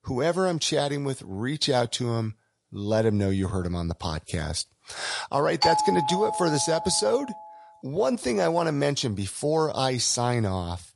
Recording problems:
garbled, watery; slightly
doorbell; loud; from 5.5 to 7 s; peak 3 dB above the speech

